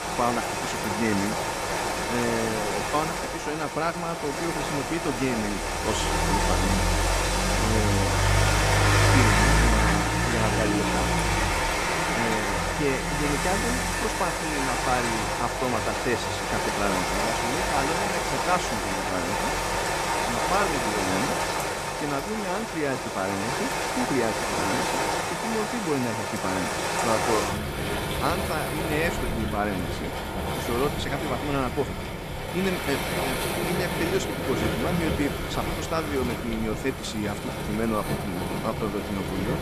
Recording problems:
rain or running water; very loud; throughout; 4 dB above the speech

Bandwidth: 14.5 kHz